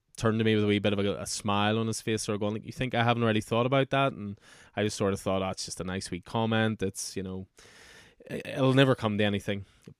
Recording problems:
none

